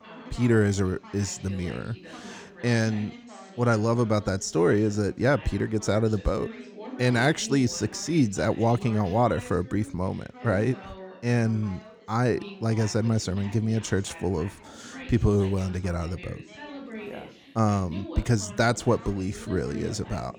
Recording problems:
background chatter; noticeable; throughout; 2 voices, 15 dB below the speech

